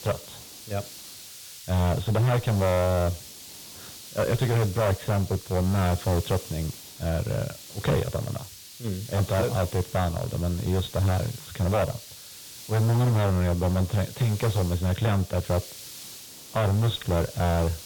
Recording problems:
distortion; heavy; 12% of the sound clipped
high frequencies cut off; severe; nothing above 4 kHz
hiss; noticeable; throughout; 15 dB below the speech

